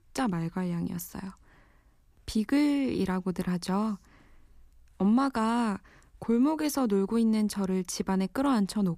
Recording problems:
none

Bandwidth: 14.5 kHz